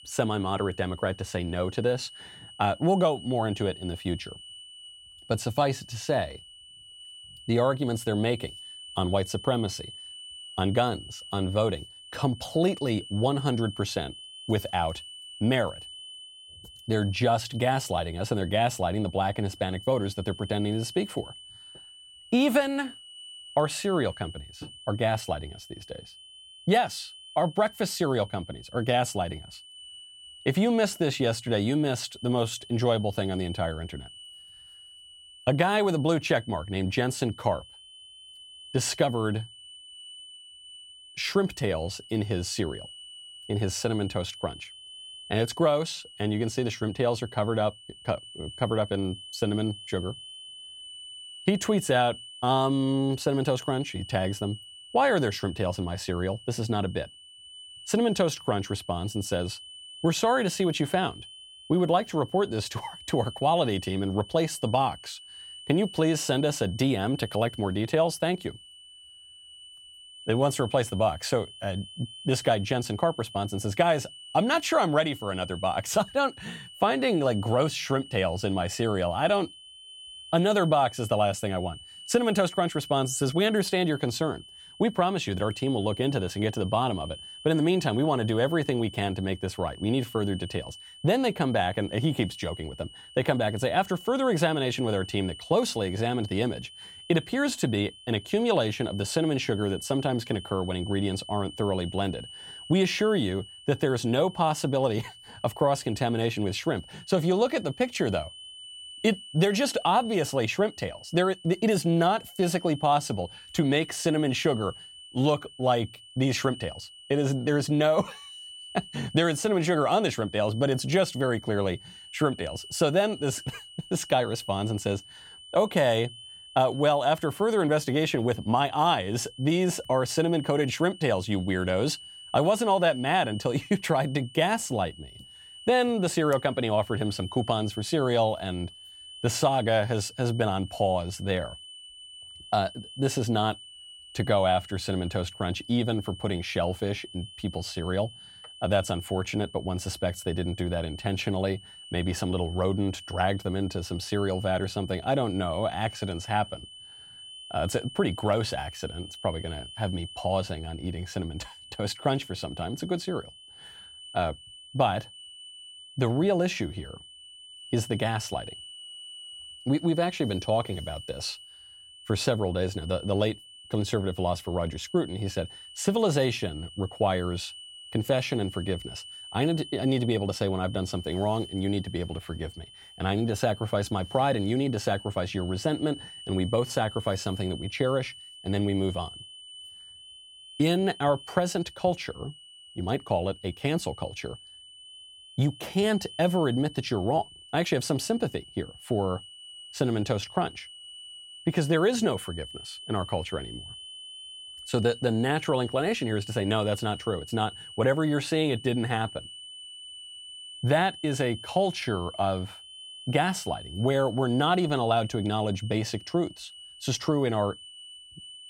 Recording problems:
high-pitched whine; noticeable; throughout; 3 kHz, 15 dB below the speech

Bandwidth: 16.5 kHz